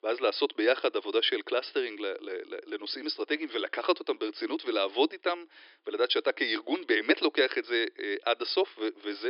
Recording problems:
thin; very; fading below 300 Hz
high frequencies cut off; noticeable; nothing above 5.5 kHz
abrupt cut into speech; at the end

